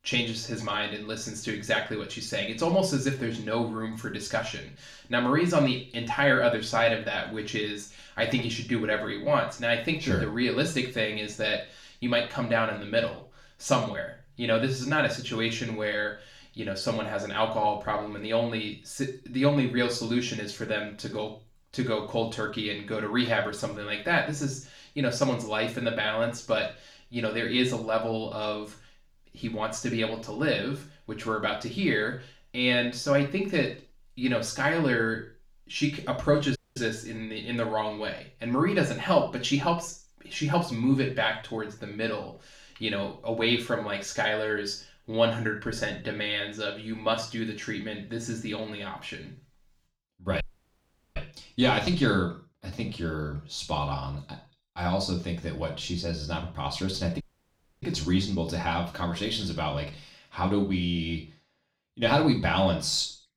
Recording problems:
off-mic speech; far
room echo; slight; dies away in 0.4 s
audio cutting out; at 37 s, at 50 s for 1 s and at 57 s for 0.5 s

